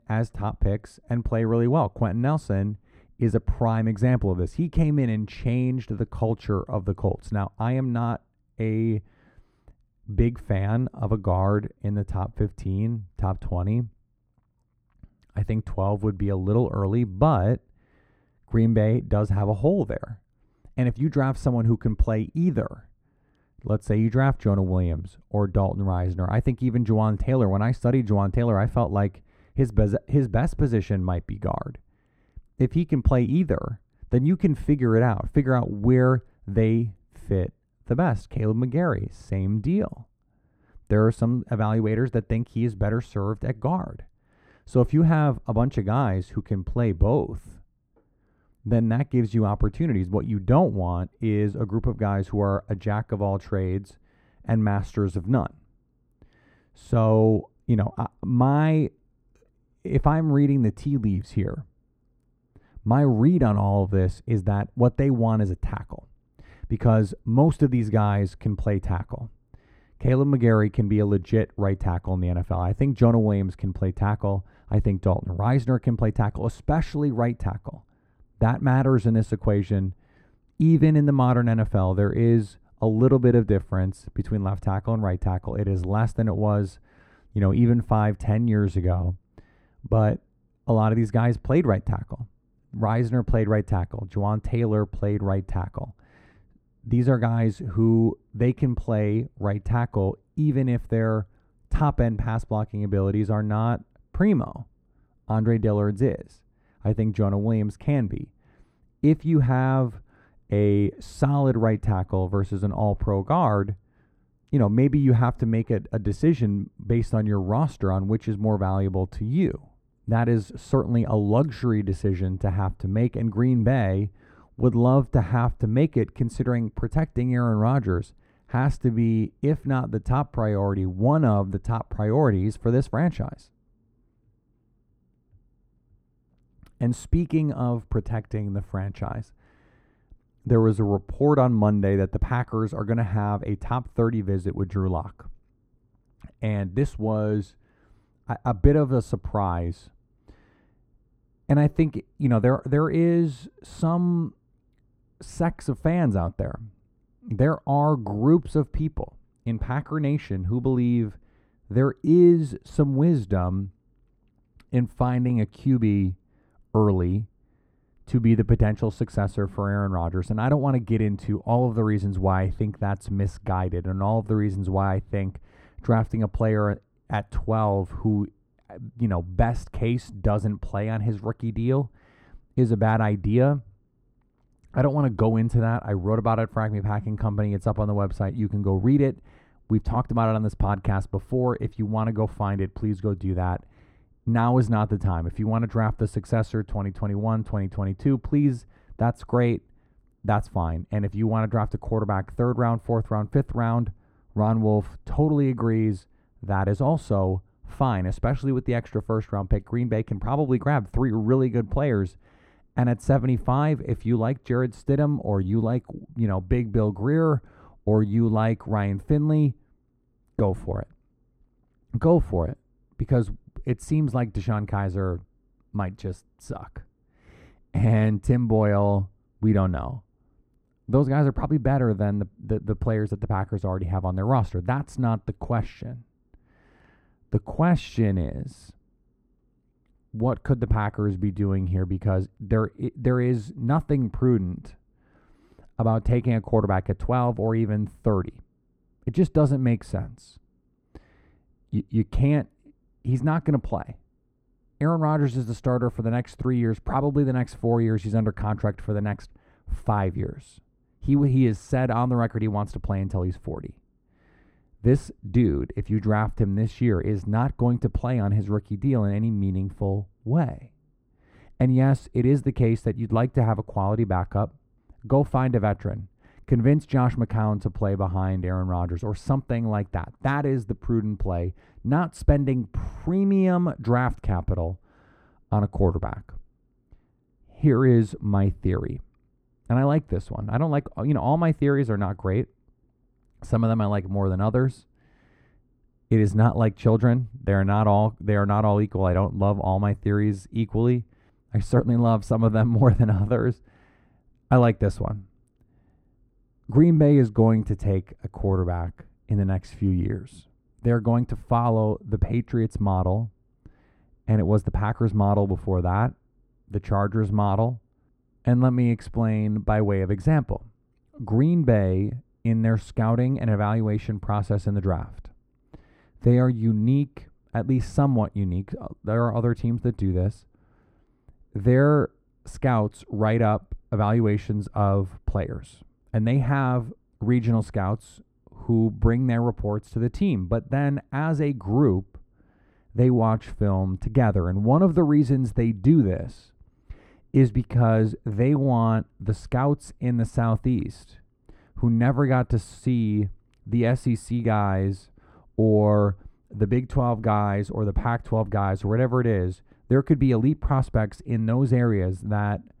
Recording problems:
muffled; very; fading above 2 kHz

